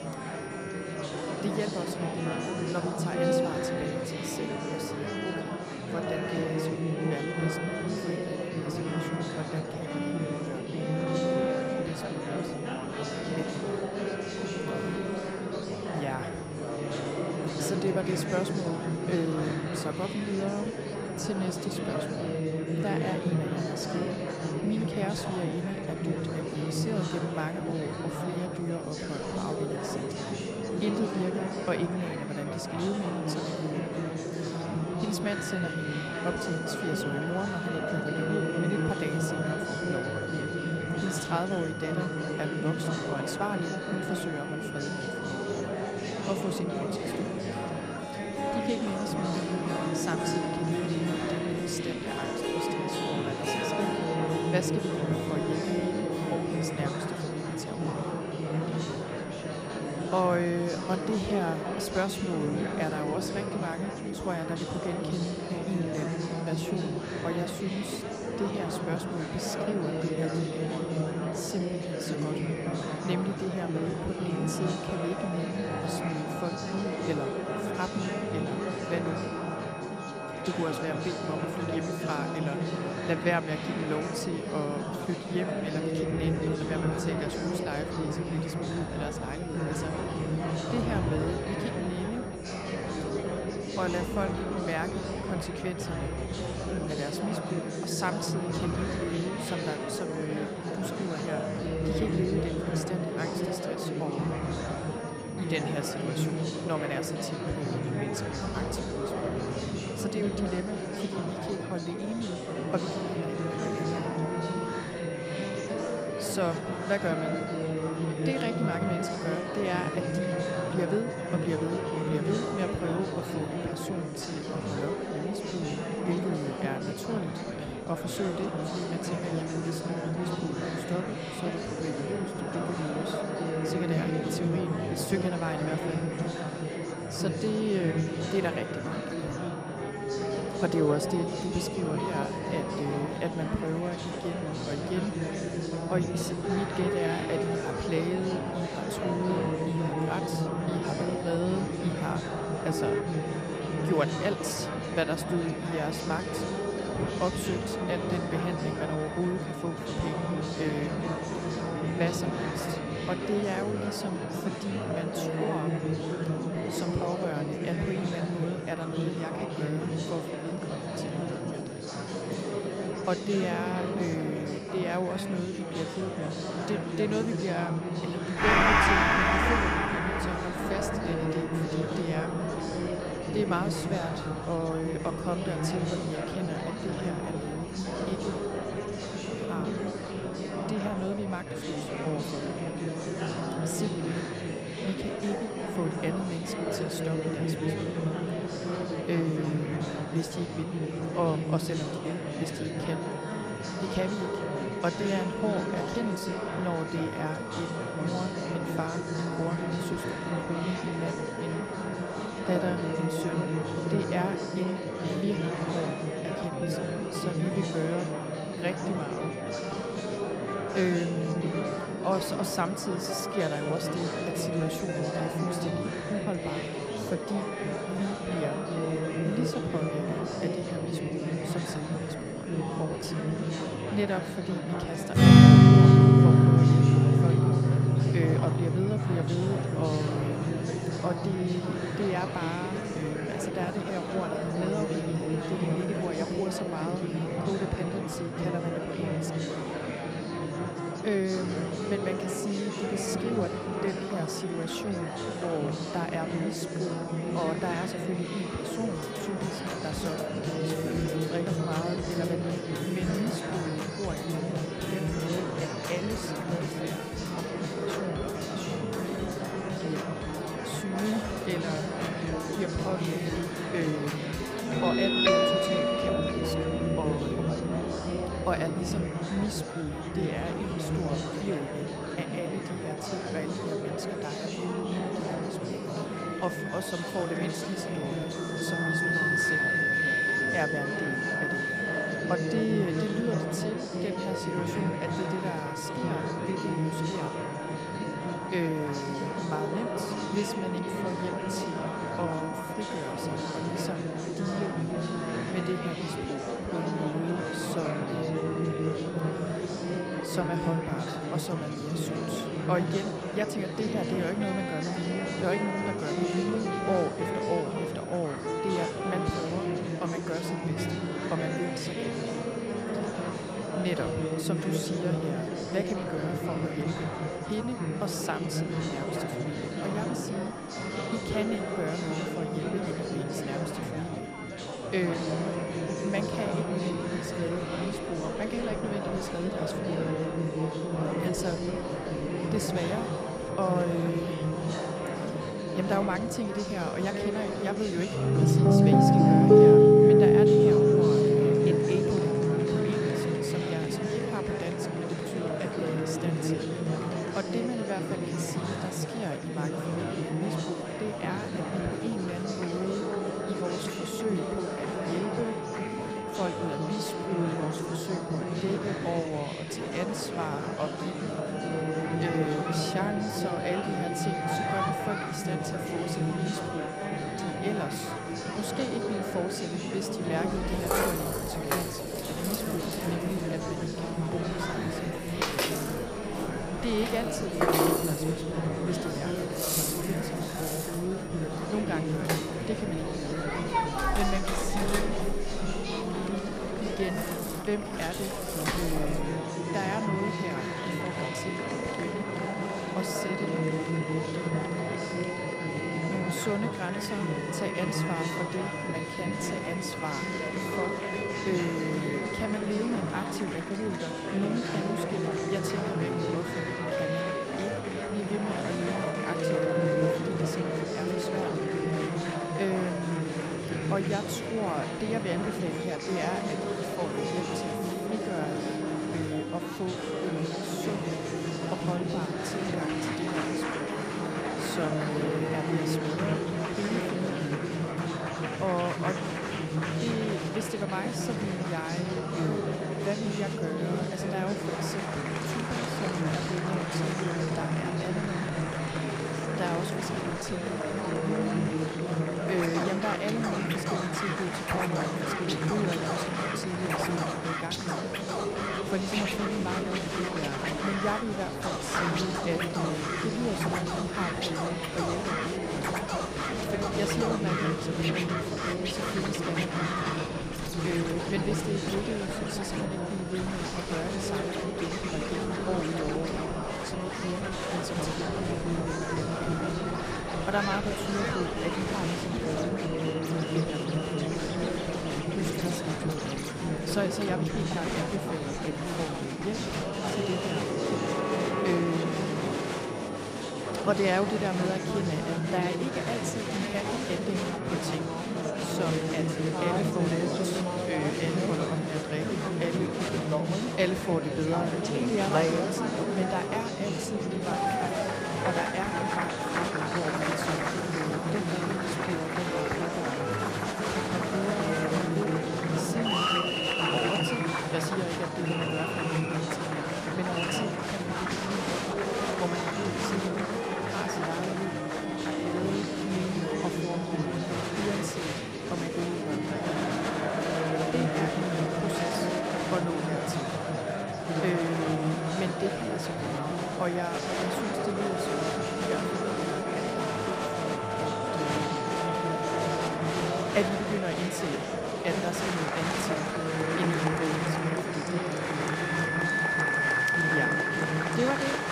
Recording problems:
echo of what is said; faint; throughout; 210 ms later, 25 dB below the speech
background music; very loud; throughout; 3 dB above the speech
murmuring crowd; very loud; throughout; 2 dB above the speech
high-pitched whine; noticeable; throughout; 9.5 kHz, 20 dB below the speech

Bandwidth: 15 kHz